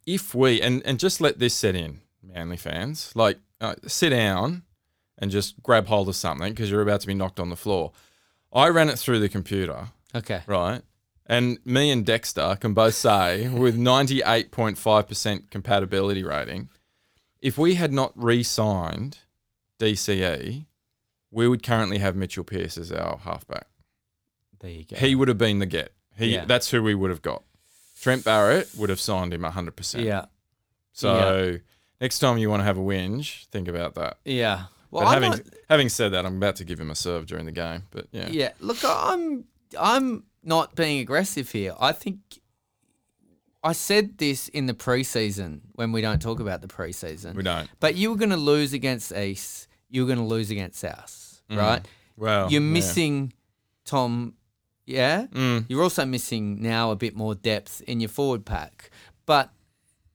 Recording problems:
none

